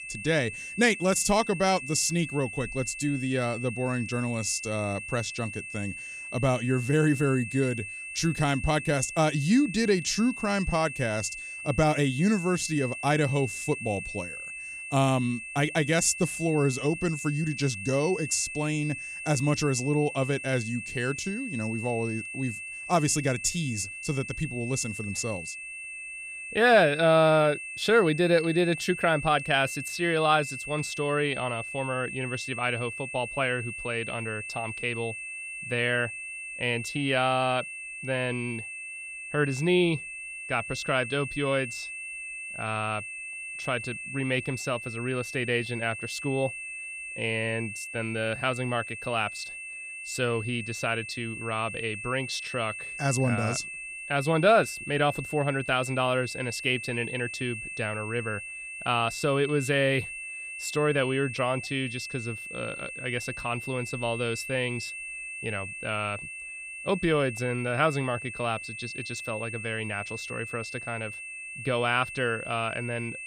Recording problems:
high-pitched whine; loud; throughout; 2.5 kHz, 8 dB below the speech

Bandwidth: 15 kHz